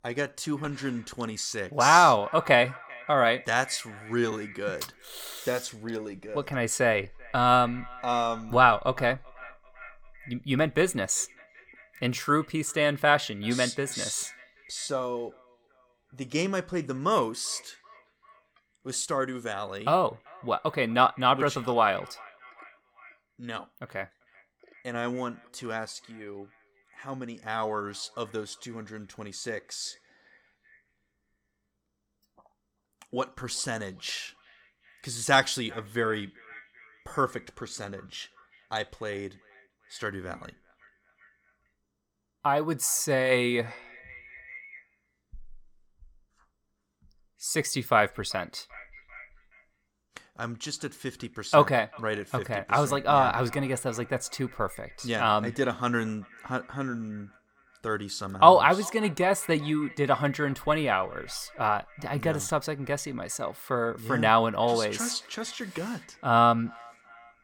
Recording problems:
echo of what is said; faint; throughout; 390 ms later, 25 dB below the speech

